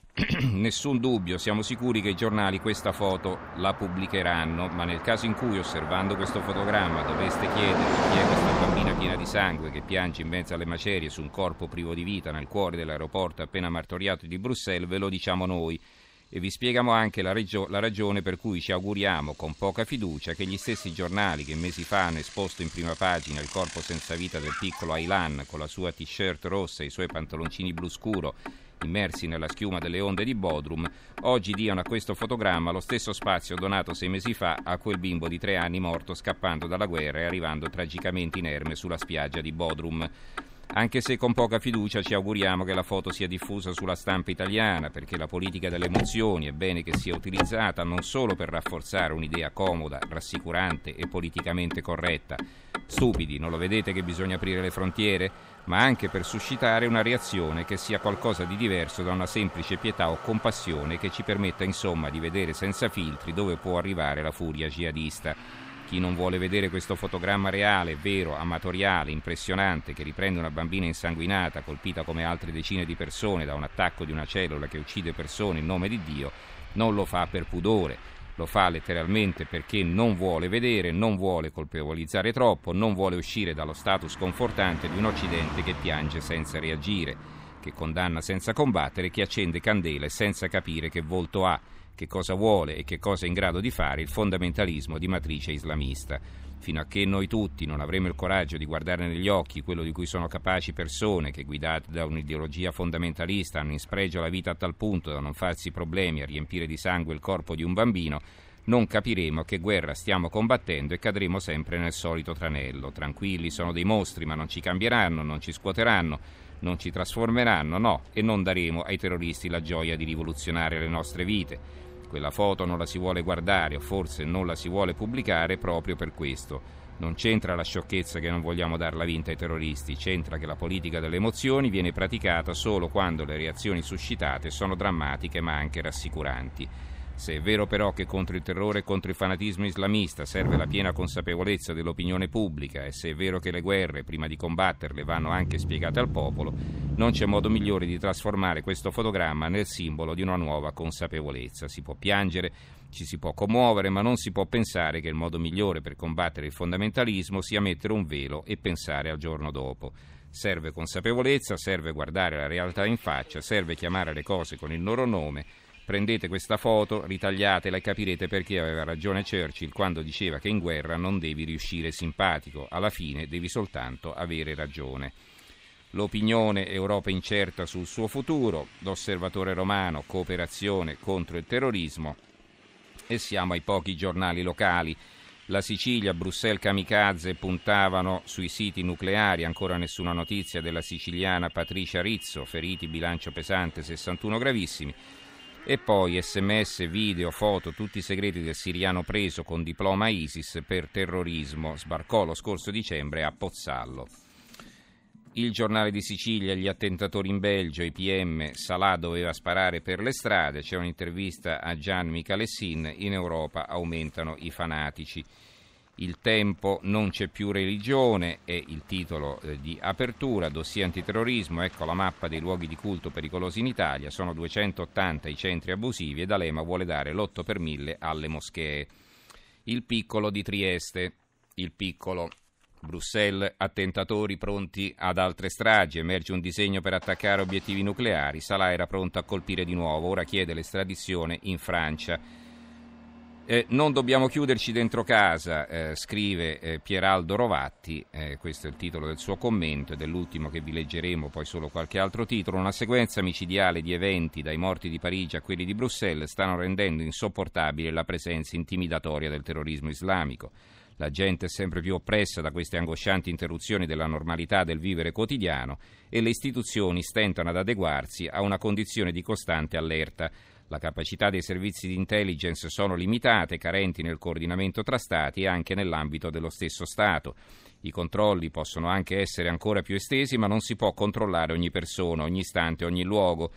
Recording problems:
traffic noise; noticeable; throughout; 10 dB below the speech

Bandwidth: 15.5 kHz